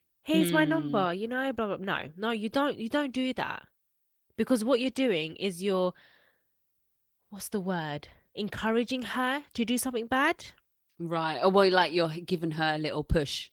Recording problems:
garbled, watery; slightly

